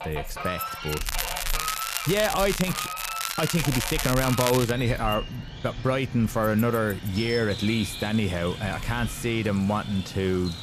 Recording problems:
animal sounds; loud; throughout; 9 dB below the speech
crackling; loud; from 1 to 4.5 s; 4 dB below the speech
household noises; noticeable; throughout; 20 dB below the speech

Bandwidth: 14.5 kHz